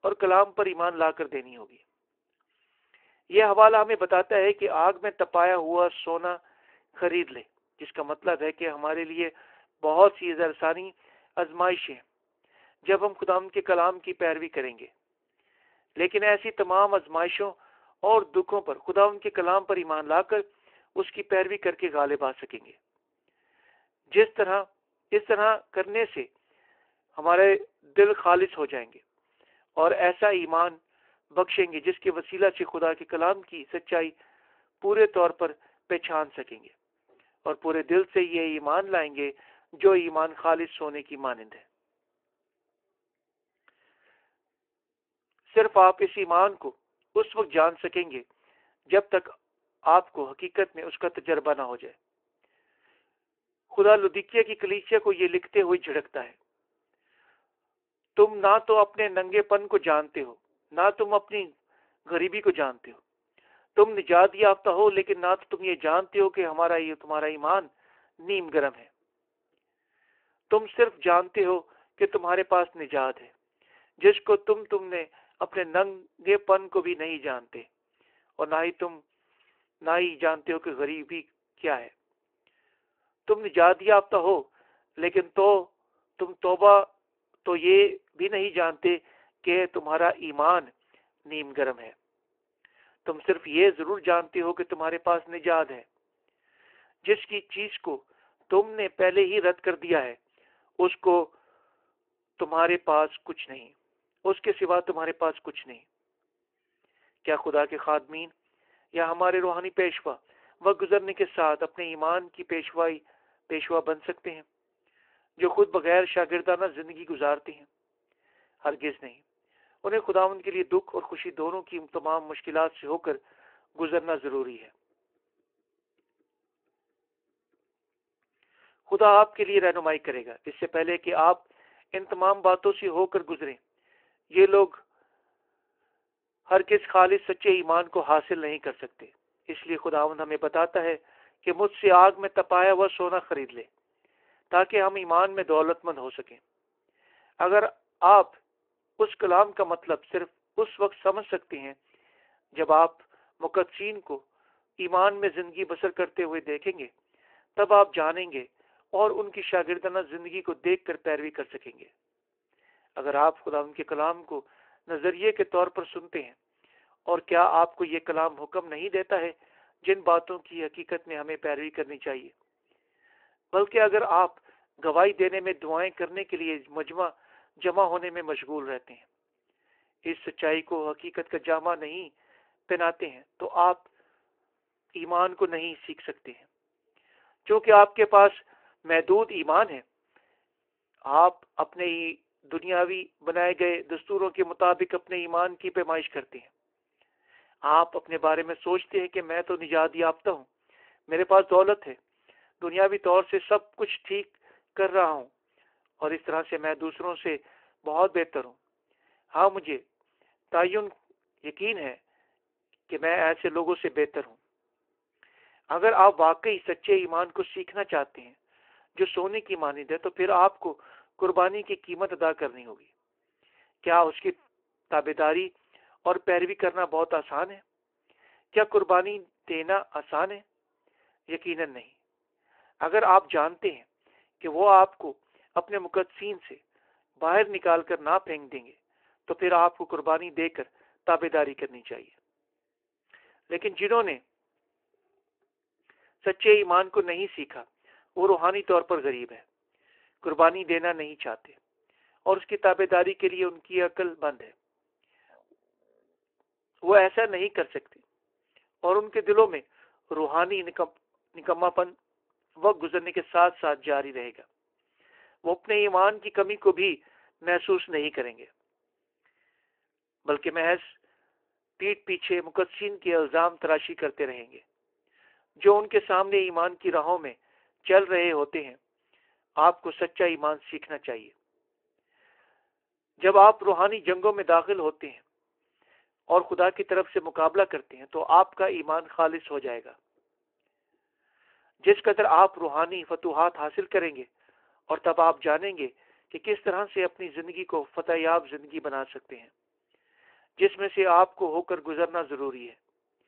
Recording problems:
phone-call audio

